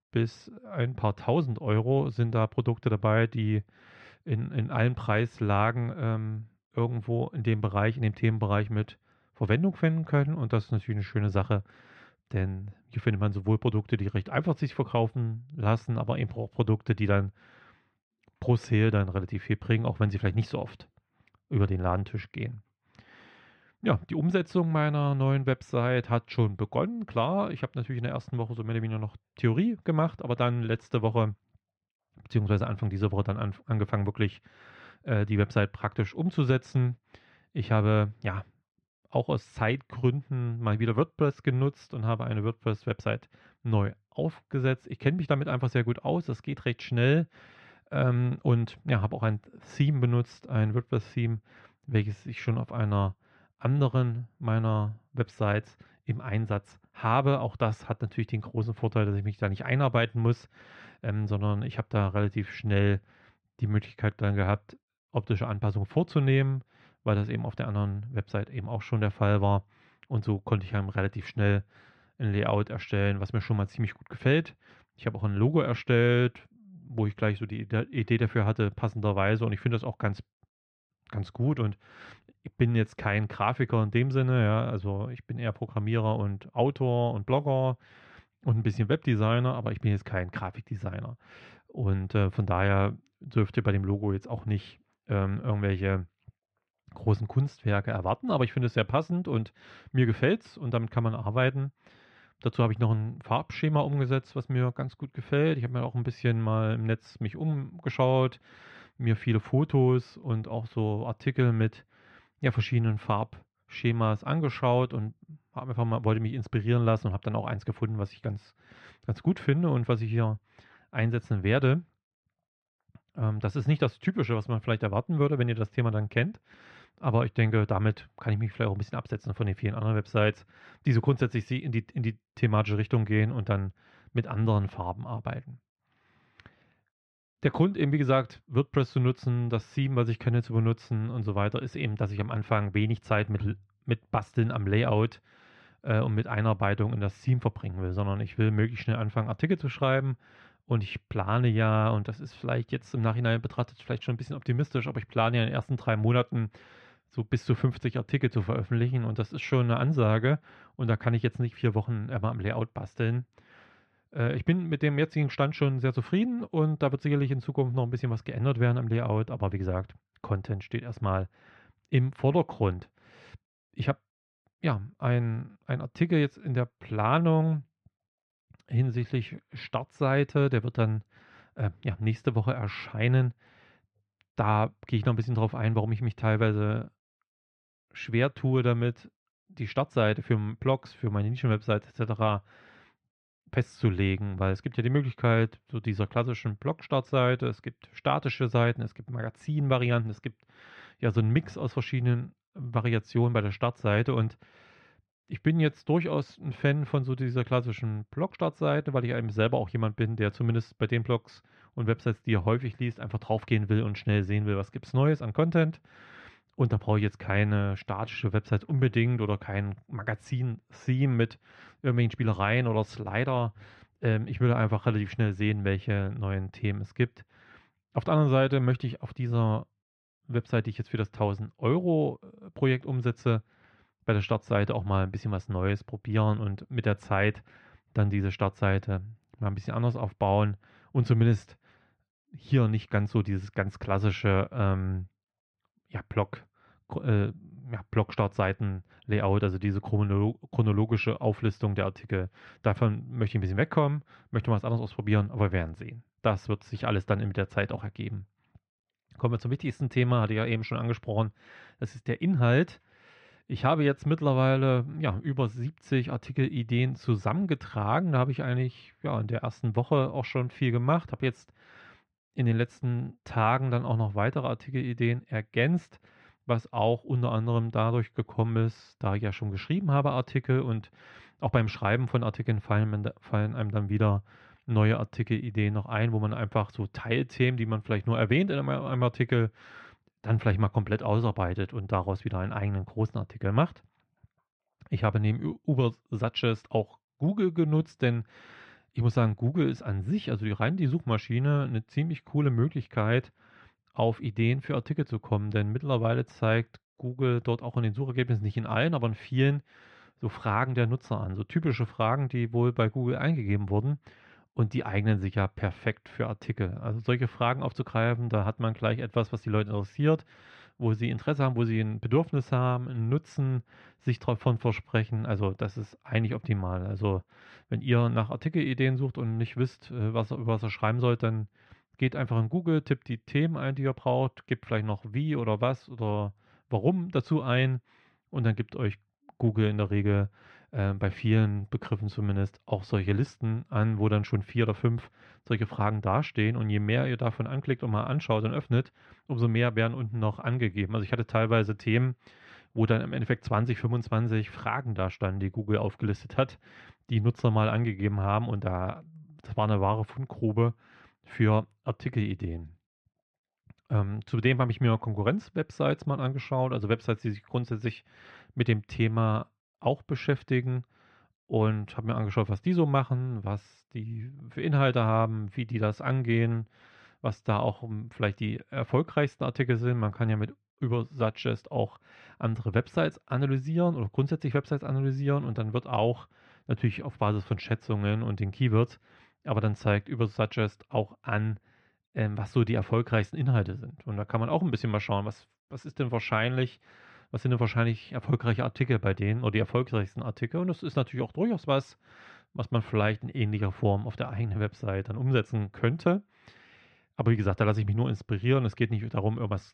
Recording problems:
muffled; slightly; fading above 2.5 kHz

